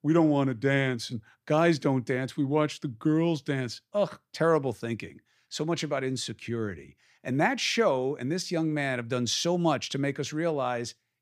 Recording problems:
none

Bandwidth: 15 kHz